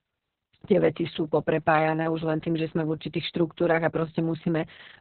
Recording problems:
garbled, watery; badly; nothing above 4 kHz

